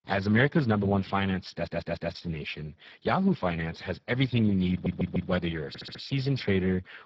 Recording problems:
garbled, watery; badly
audio stuttering; at 1.5 s, at 4.5 s and at 5.5 s

